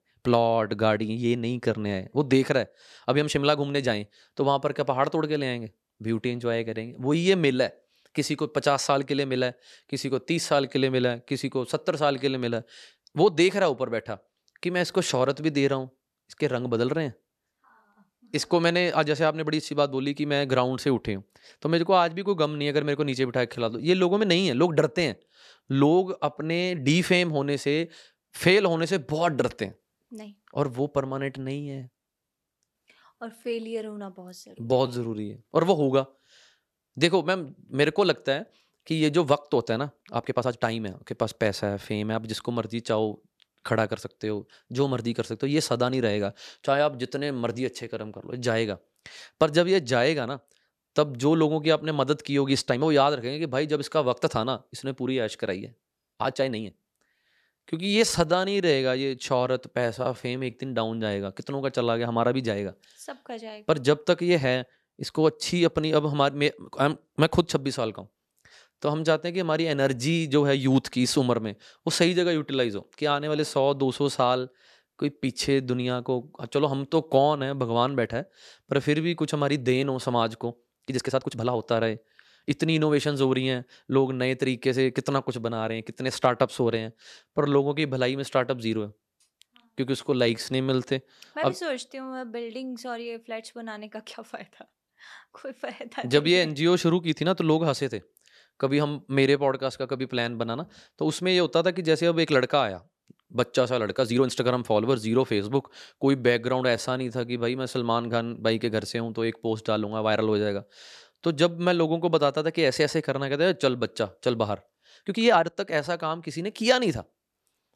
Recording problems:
uneven, jittery; strongly; from 1.5 s to 1:56

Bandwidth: 13.5 kHz